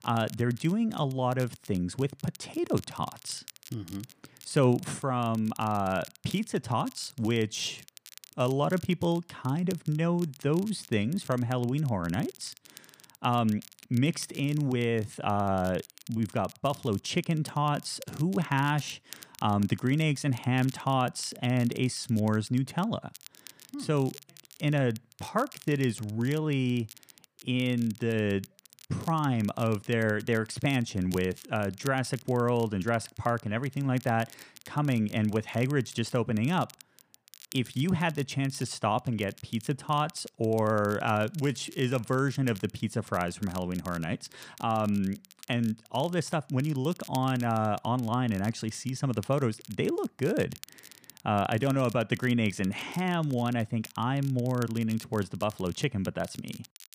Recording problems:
crackle, like an old record; faint; 20 dB below the speech

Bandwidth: 15 kHz